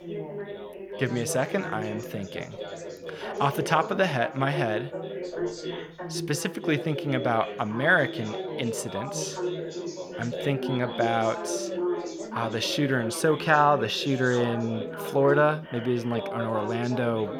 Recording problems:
background chatter; loud; throughout; 3 voices, 8 dB below the speech

